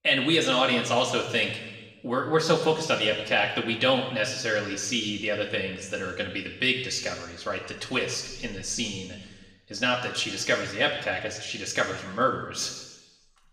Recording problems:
room echo; noticeable; dies away in 1.2 s
off-mic speech; somewhat distant

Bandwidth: 15.5 kHz